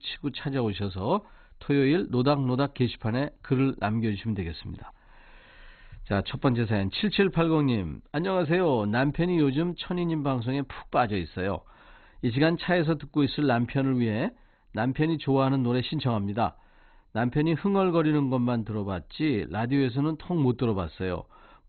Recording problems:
garbled, watery; badly; nothing above 4 kHz

